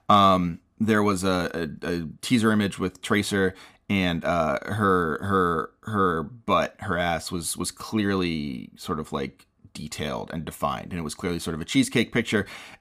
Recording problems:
none

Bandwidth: 15 kHz